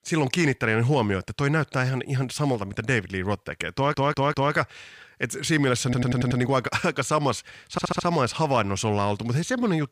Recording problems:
audio stuttering; at 3.5 s, at 6 s and at 7.5 s

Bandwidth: 15 kHz